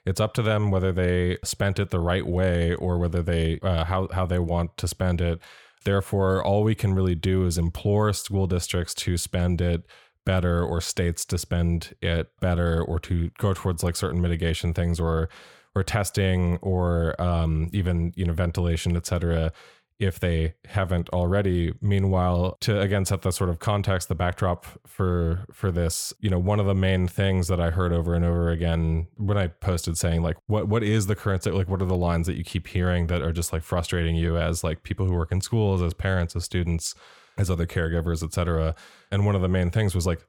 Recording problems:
none

